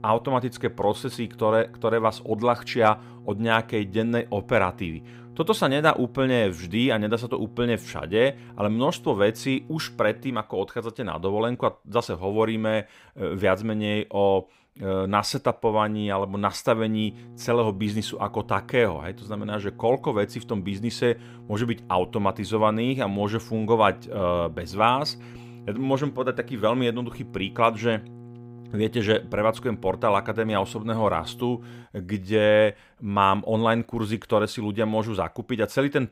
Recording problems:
electrical hum; faint; until 10 s and from 17 to 32 s; 60 Hz, 25 dB below the speech

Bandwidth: 15.5 kHz